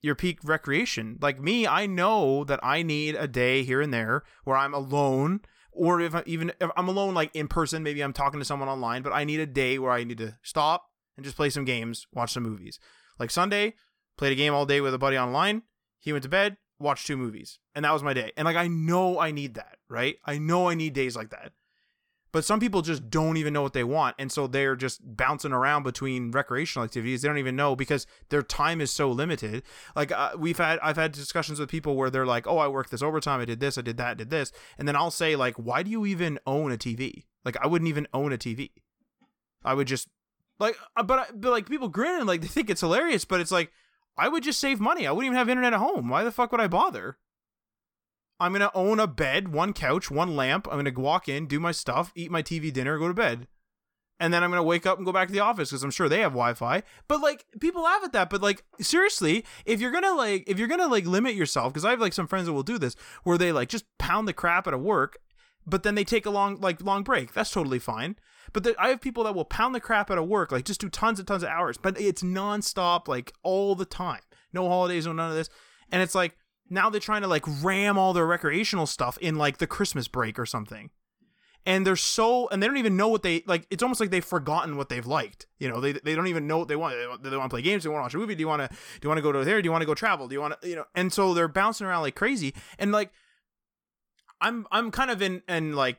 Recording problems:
none

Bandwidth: 18 kHz